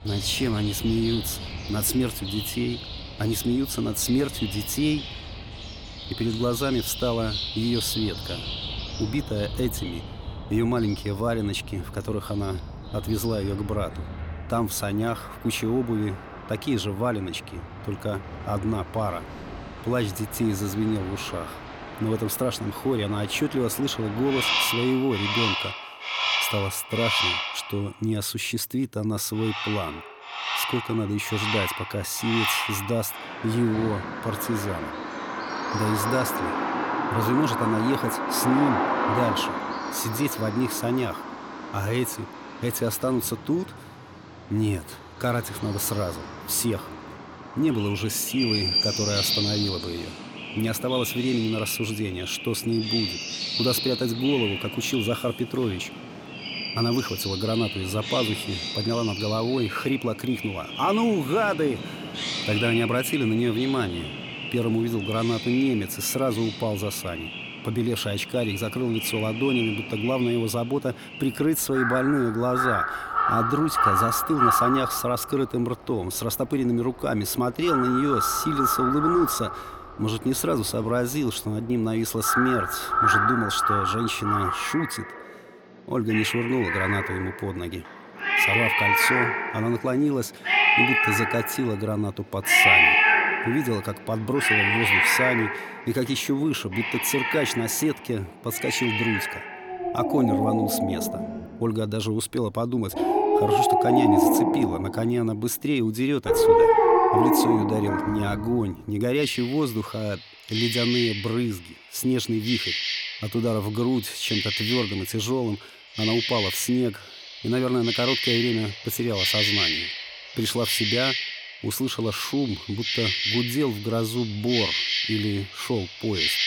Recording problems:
animal sounds; very loud; throughout; 1 dB above the speech

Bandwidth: 17 kHz